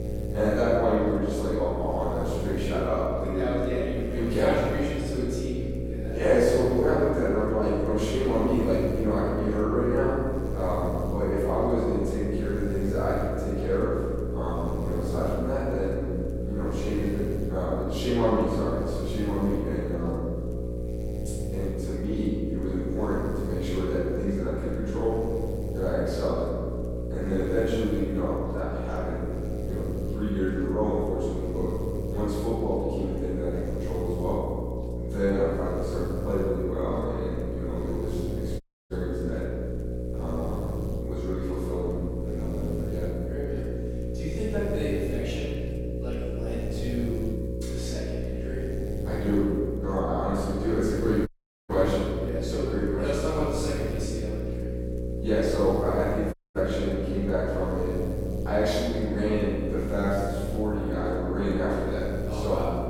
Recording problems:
room echo; strong; dies away in 1.8 s
off-mic speech; far
electrical hum; loud; throughout; 60 Hz, 8 dB below the speech
audio cutting out; at 39 s, at 51 s and at 56 s

